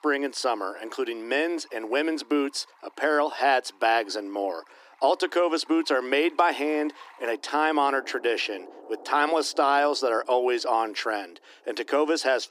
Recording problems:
thin; somewhat; fading below 300 Hz
rain or running water; faint; throughout; 25 dB below the speech

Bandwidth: 15 kHz